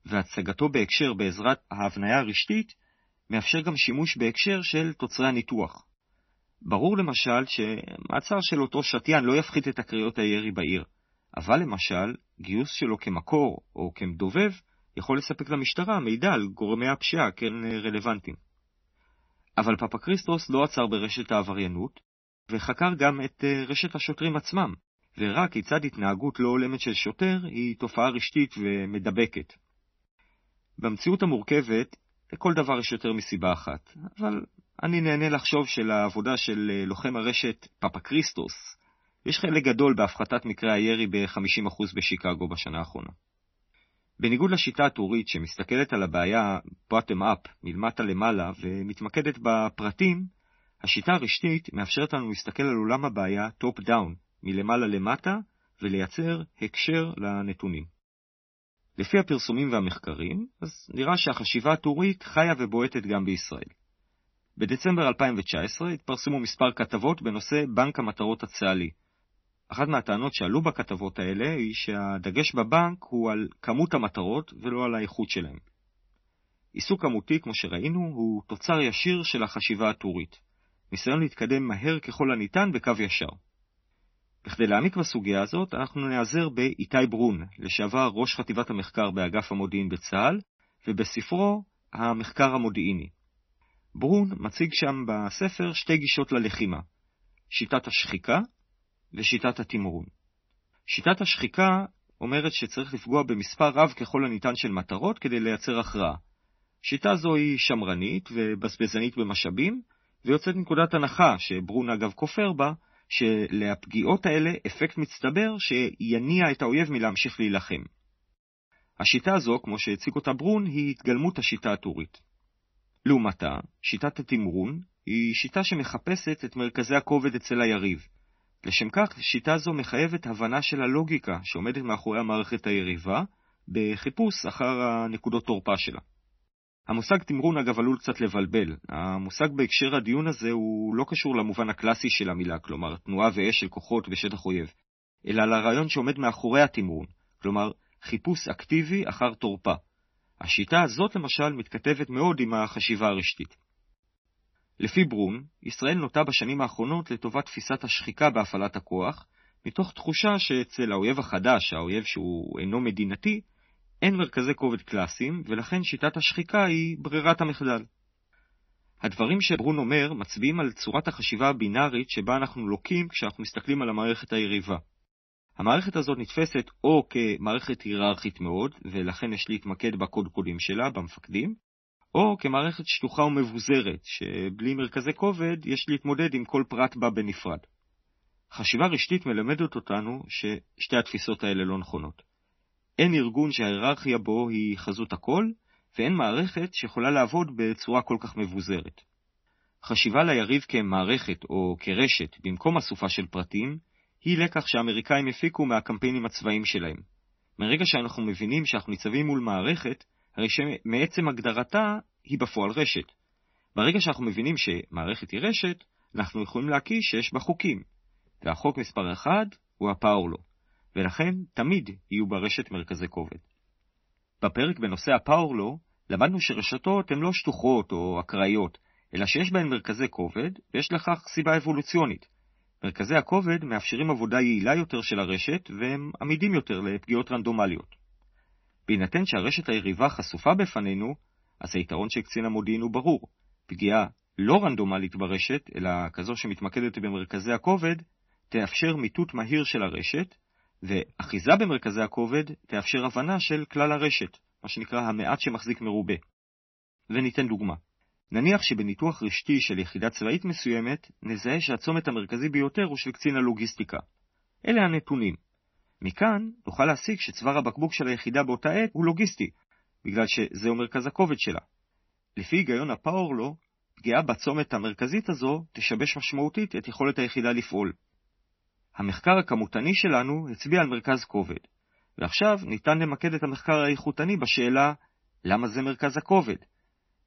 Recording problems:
garbled, watery; slightly; nothing above 6 kHz

